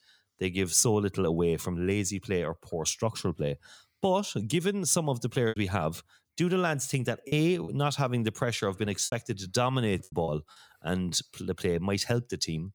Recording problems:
choppy; very; from 5.5 to 7.5 s and from 9 to 10 s; 6% of the speech affected

